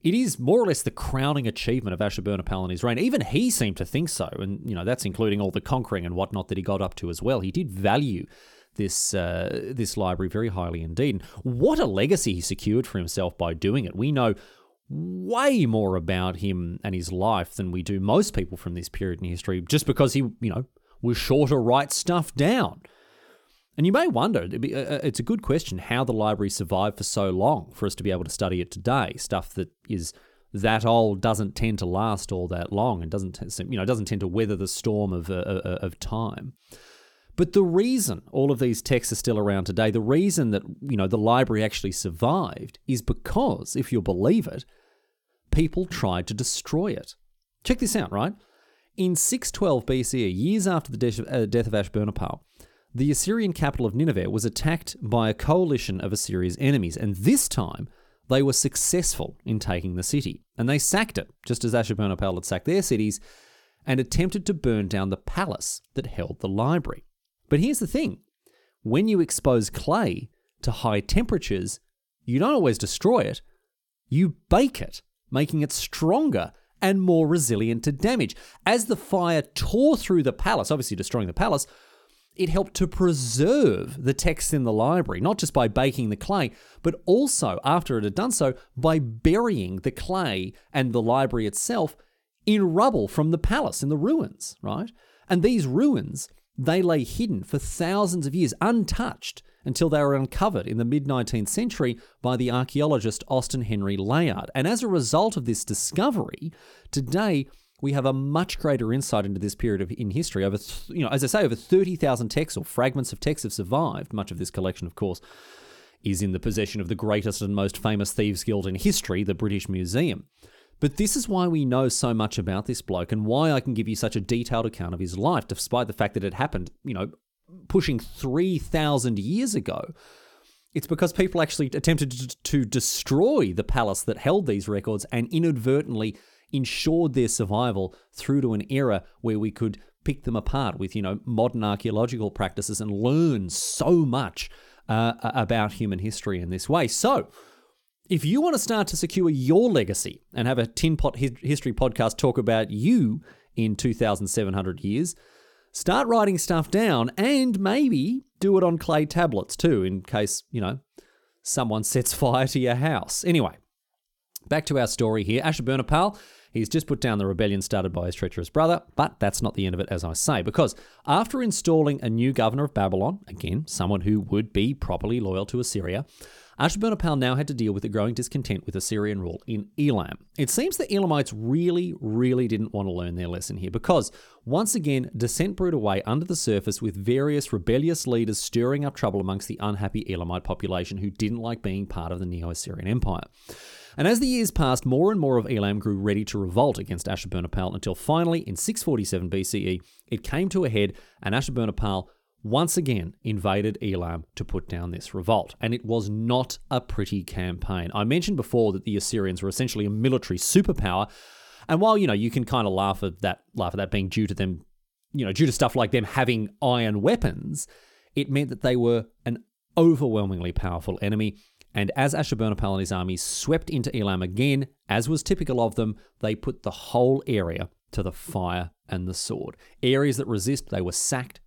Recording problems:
none

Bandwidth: 18 kHz